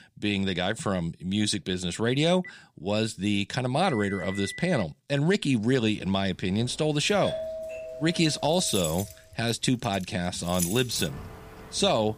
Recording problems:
household noises; noticeable; from 6 s on; 10 dB below the speech
phone ringing; faint; from 2.5 to 5 s; peak 10 dB below the speech
doorbell; noticeable; from 7 to 9 s; peak 6 dB below the speech

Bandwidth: 15 kHz